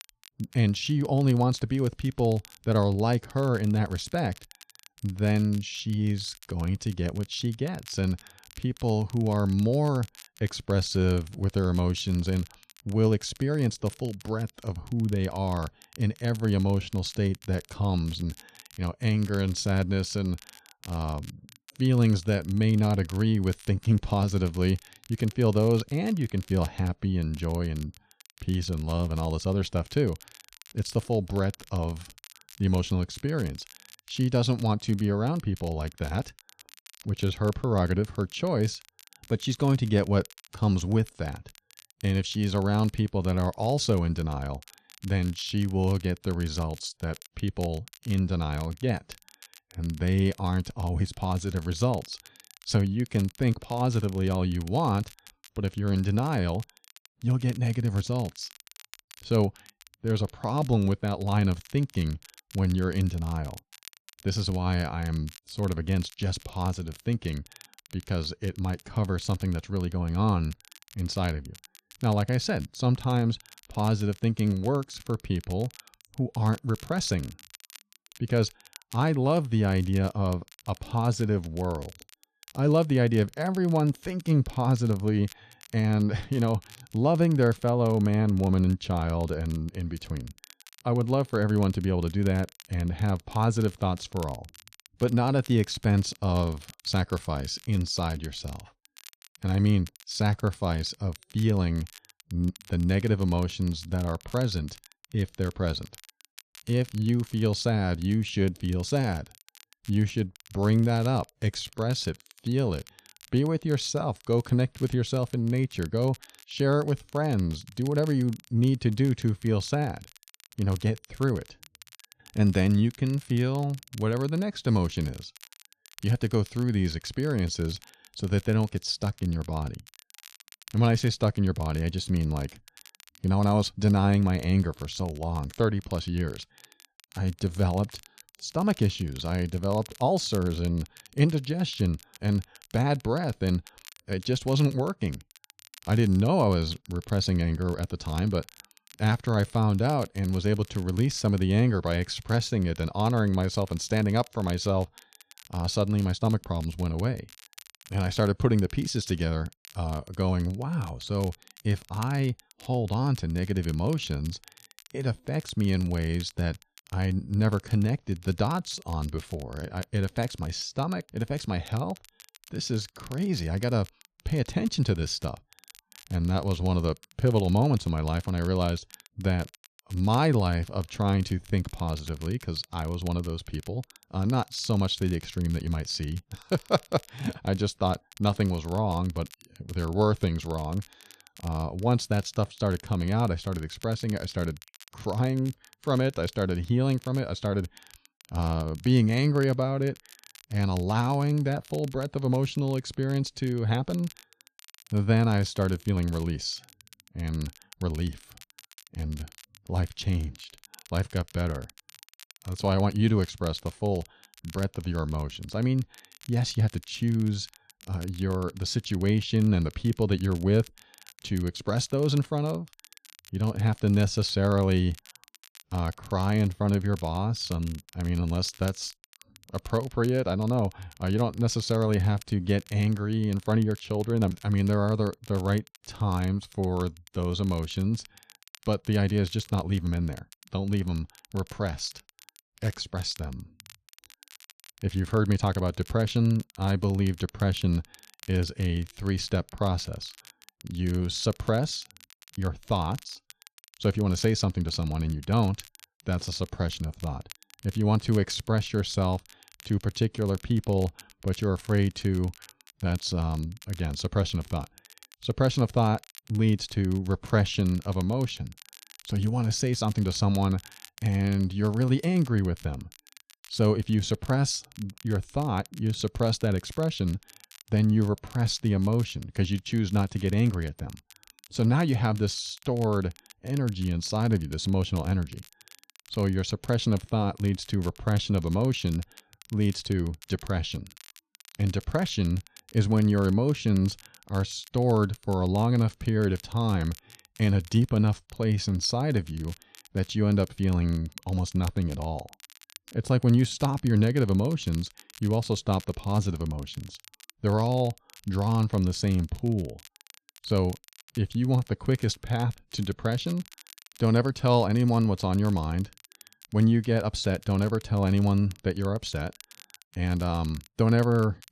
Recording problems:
crackle, like an old record; faint; 25 dB below the speech

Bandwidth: 14 kHz